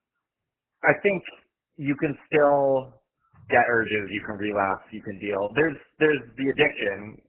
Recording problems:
garbled, watery; badly; nothing above 3 kHz

